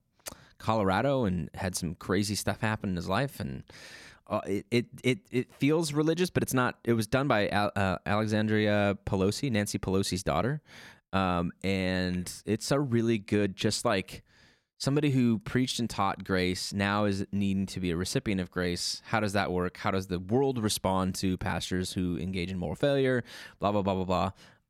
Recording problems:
none

